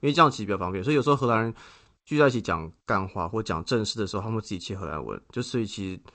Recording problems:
garbled, watery; slightly; nothing above 8 kHz

